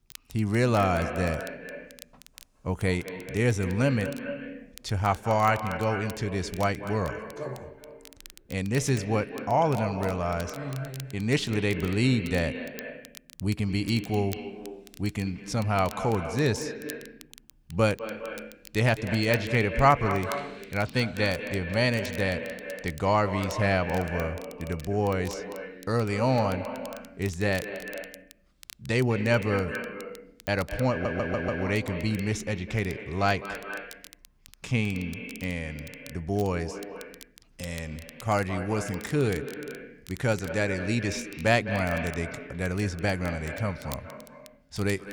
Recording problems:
echo of what is said; strong; throughout; 210 ms later, 9 dB below the speech
crackle, like an old record; faint; 20 dB below the speech
audio stuttering; at 31 s

